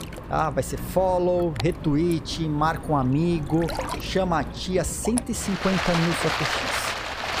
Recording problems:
rain or running water; loud; throughout; 5 dB below the speech

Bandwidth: 15 kHz